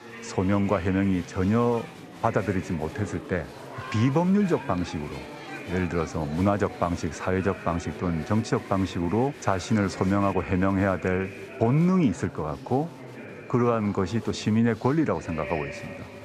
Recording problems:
chatter from many people; noticeable; throughout; 15 dB below the speech

